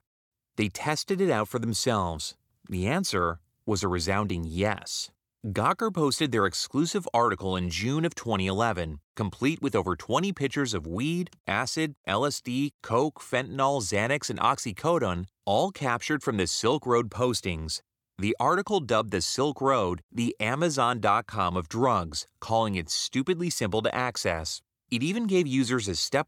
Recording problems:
none

